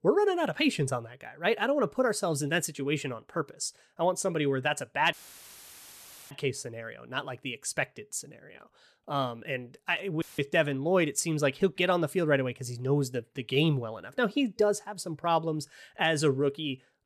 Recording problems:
audio cutting out; filled with static; at 5 s for 1 s and at 10 s

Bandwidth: 13.5 kHz